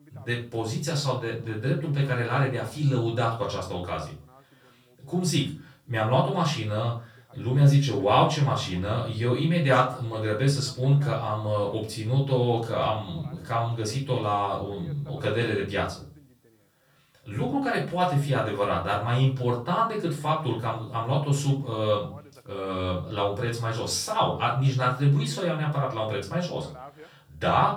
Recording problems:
off-mic speech; far
room echo; slight; dies away in 0.3 s
voice in the background; faint; throughout; 25 dB below the speech

